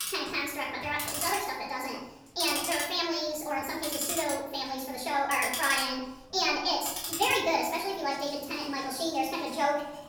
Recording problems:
off-mic speech; far
wrong speed and pitch; too fast and too high; 1.5 times normal speed
room echo; noticeable; dies away in 0.8 s
household noises; loud; throughout; 4 dB below the speech

